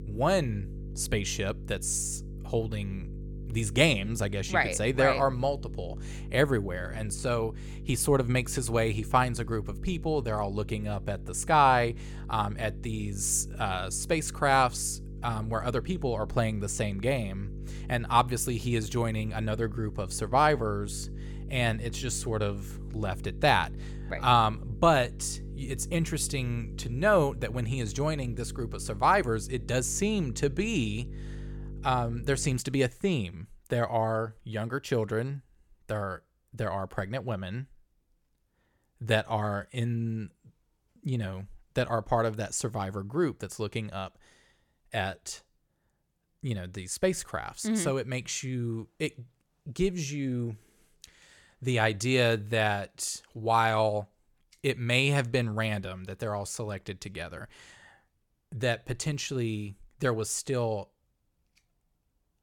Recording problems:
electrical hum; faint; until 33 s; 50 Hz, 20 dB below the speech

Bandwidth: 17 kHz